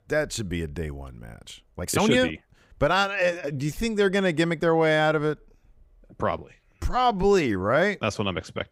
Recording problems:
uneven, jittery; strongly; from 1.5 to 8 s

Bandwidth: 15.5 kHz